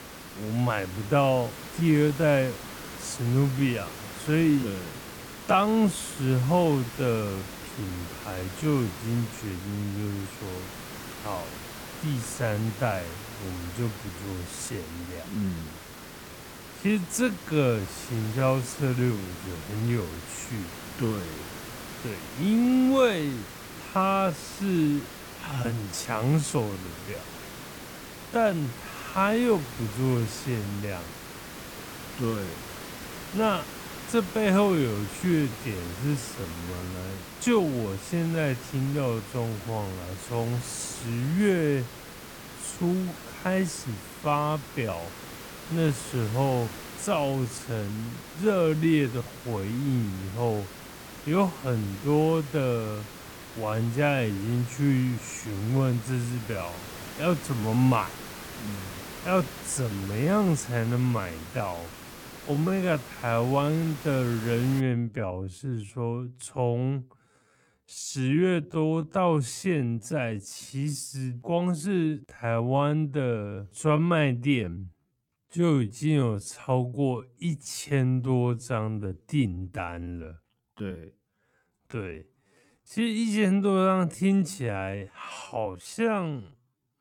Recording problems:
wrong speed, natural pitch; too slow; 0.5 times normal speed
hiss; noticeable; until 1:05; 10 dB below the speech

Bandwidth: 18 kHz